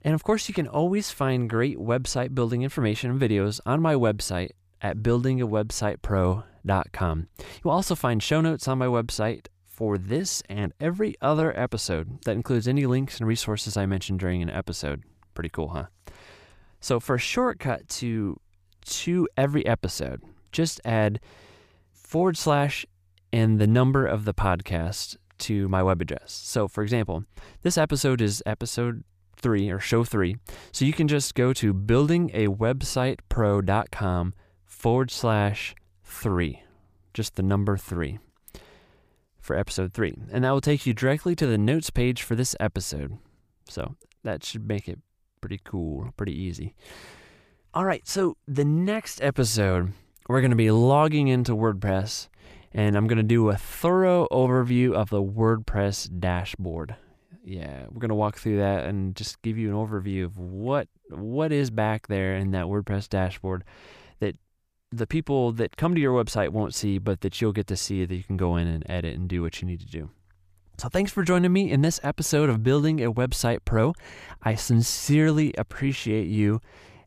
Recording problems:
none

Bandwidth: 15 kHz